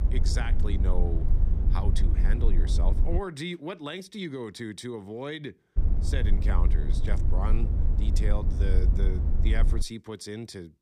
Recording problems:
low rumble; loud; until 3 s and from 6 to 10 s; 6 dB below the speech

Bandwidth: 15 kHz